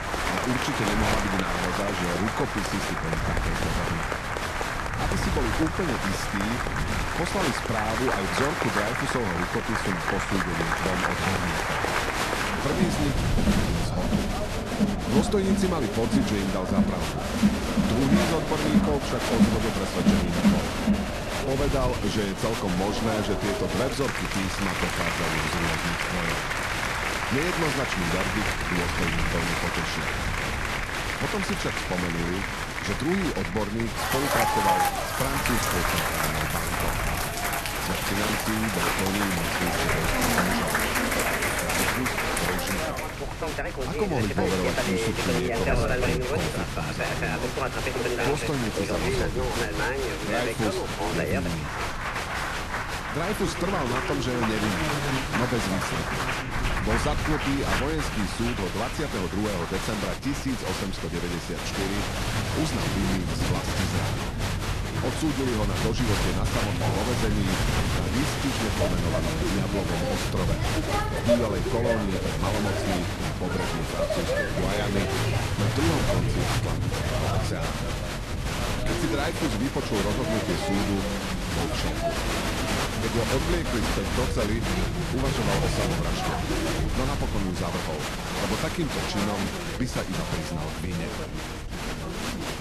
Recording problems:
crowd noise; very loud; throughout; 3 dB above the speech
background chatter; noticeable; throughout; 3 voices, 20 dB below the speech
wind noise on the microphone; occasional gusts; 15 dB below the speech

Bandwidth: 13.5 kHz